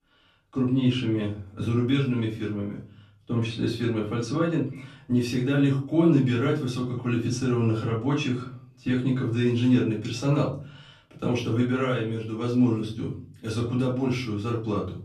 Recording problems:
off-mic speech; far
room echo; slight; dies away in 0.5 s

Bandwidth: 13.5 kHz